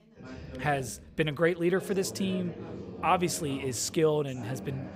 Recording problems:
background chatter; noticeable; throughout; 4 voices, 15 dB below the speech

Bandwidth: 15.5 kHz